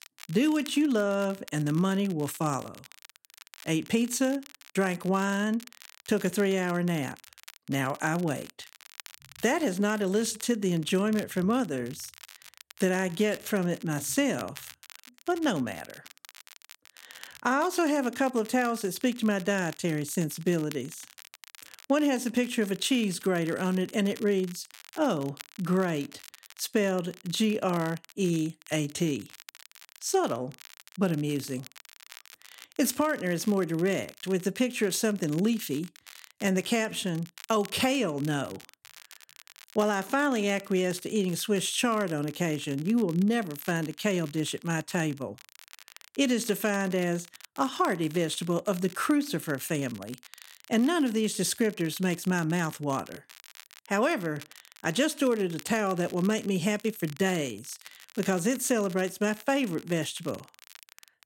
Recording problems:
crackle, like an old record; faint; 20 dB below the speech

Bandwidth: 16 kHz